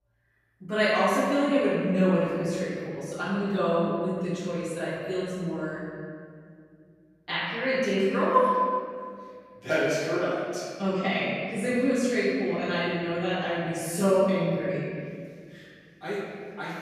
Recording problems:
room echo; strong; dies away in 2 s
off-mic speech; far

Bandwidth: 14.5 kHz